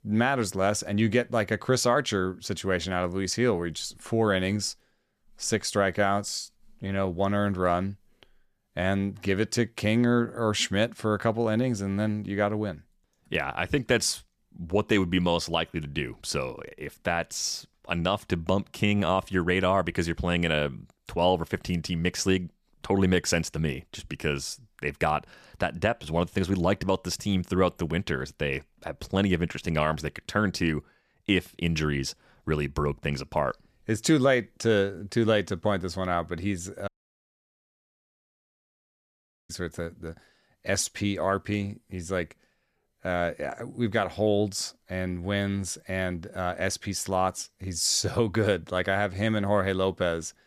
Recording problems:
audio cutting out; at 37 s for 2.5 s

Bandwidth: 14.5 kHz